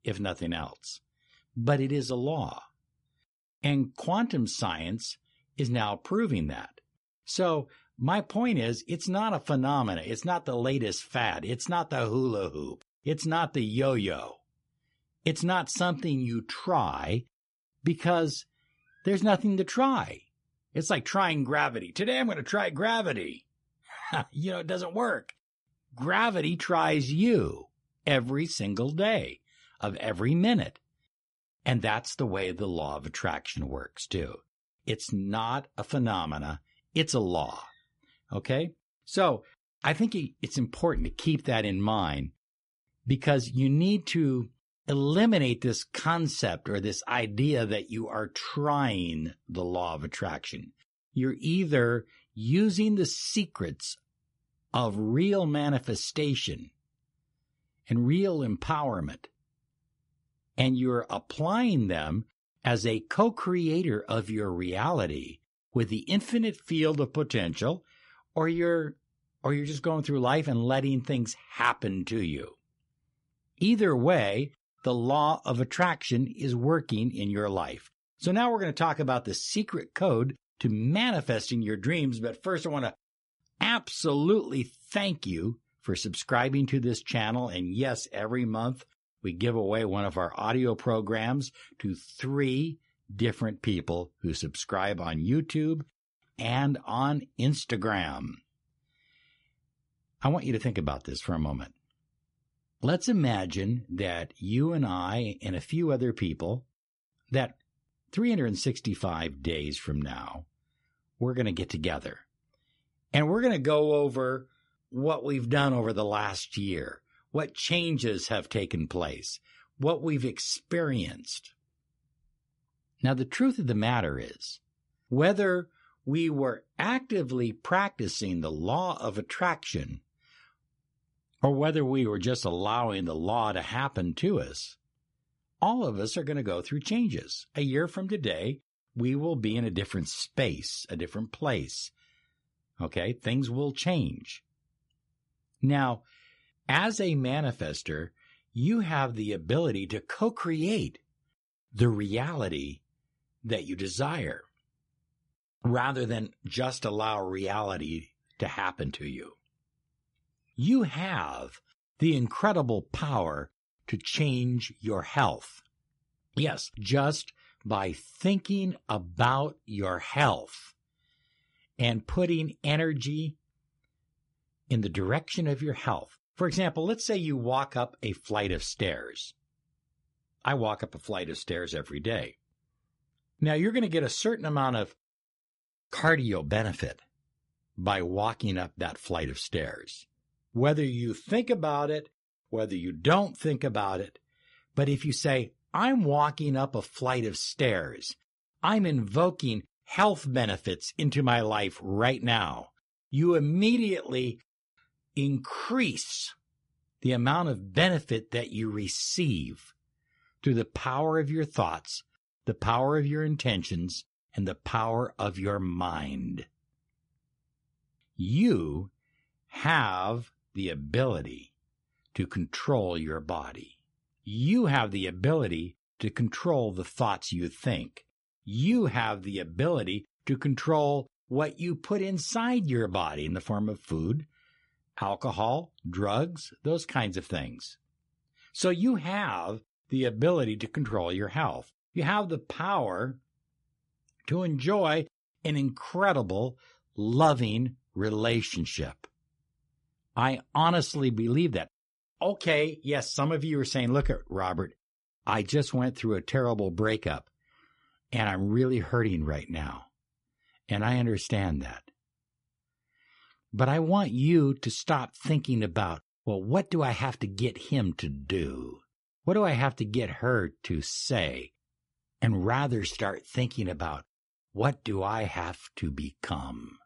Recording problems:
garbled, watery; slightly; nothing above 11 kHz

